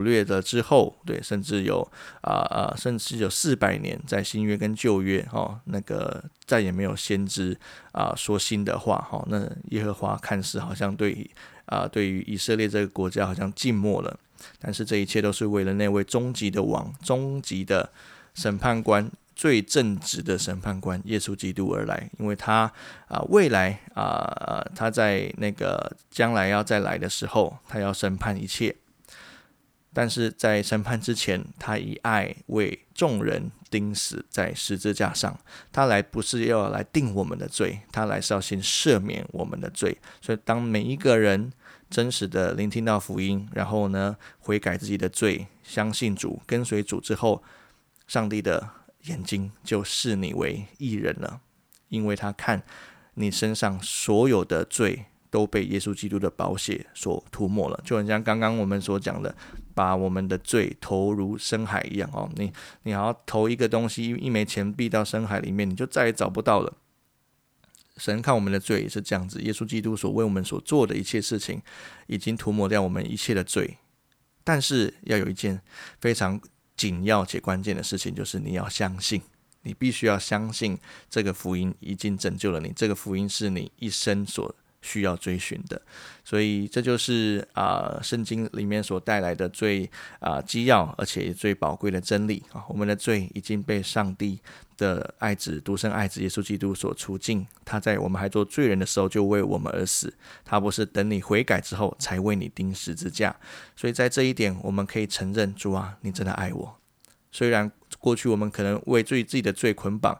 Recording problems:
abrupt cut into speech; at the start

